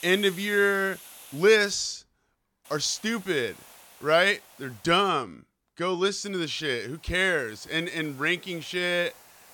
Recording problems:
hiss; faint; until 1.5 s, from 2.5 to 5 s and from 6 s on; 20 dB below the speech

